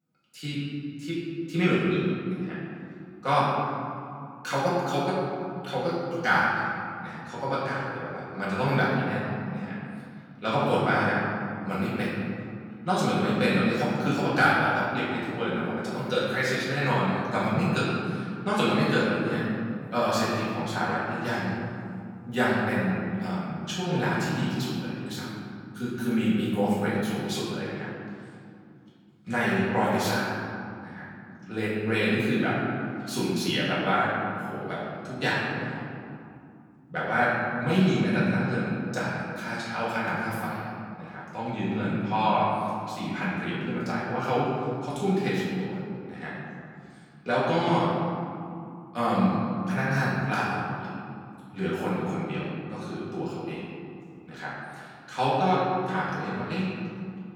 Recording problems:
room echo; strong; dies away in 2.5 s
off-mic speech; far

